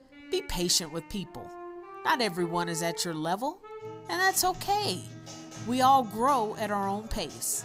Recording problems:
background music; noticeable; throughout; 15 dB below the speech

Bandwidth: 15.5 kHz